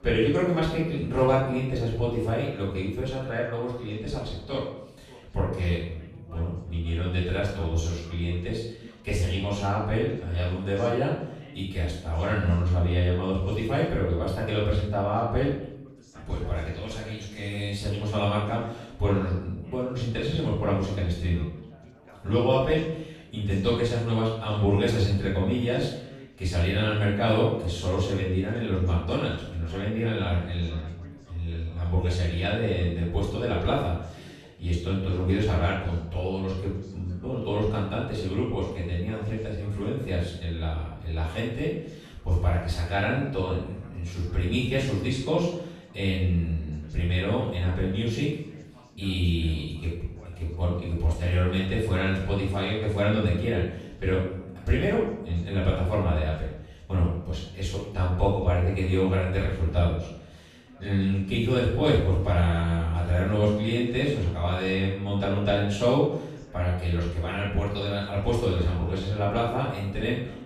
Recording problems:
off-mic speech; far
room echo; noticeable; dies away in 0.7 s
background chatter; faint; throughout; 4 voices, 25 dB below the speech

